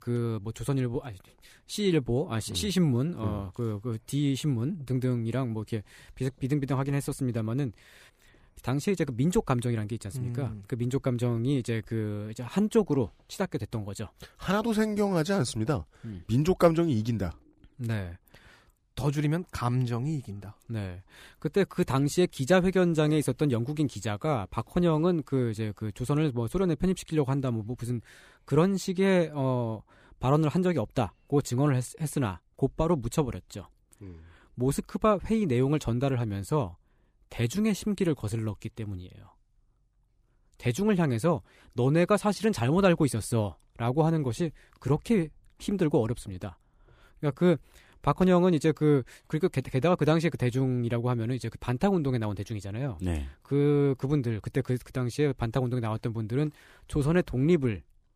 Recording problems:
none

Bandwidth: 15 kHz